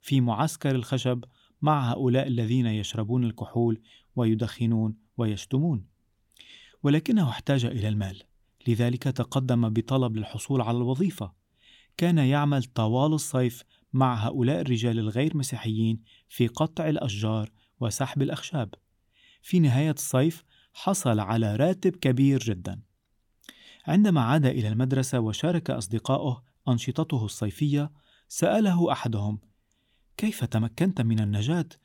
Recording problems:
none

